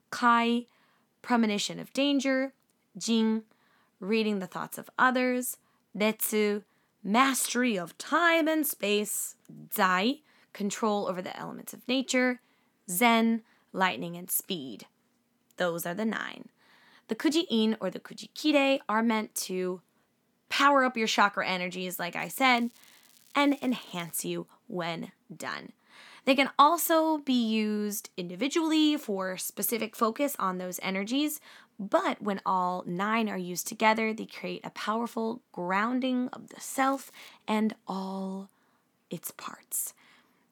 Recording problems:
crackling; faint; from 22 to 24 s and at 37 s; 30 dB below the speech

